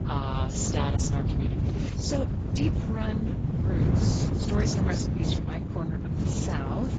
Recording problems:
garbled, watery; badly; nothing above 7.5 kHz
wind noise on the microphone; heavy; 1 dB below the speech

